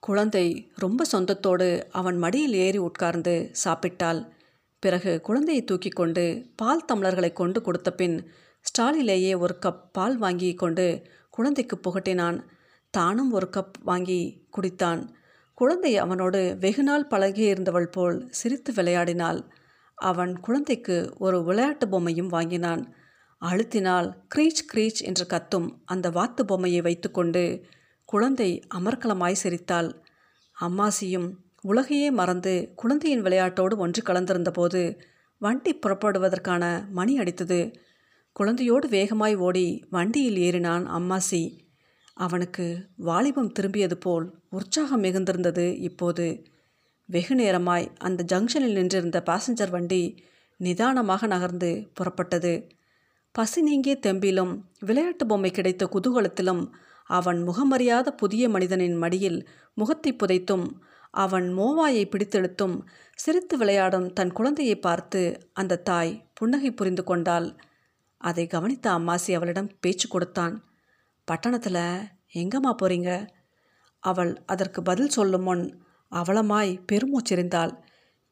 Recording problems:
none

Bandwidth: 15 kHz